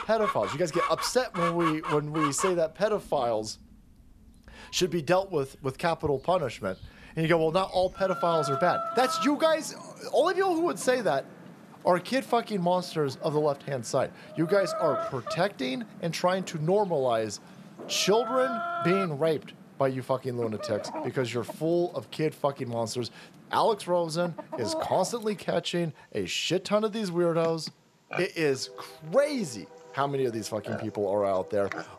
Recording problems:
animal sounds; loud; throughout; 8 dB below the speech

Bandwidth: 14 kHz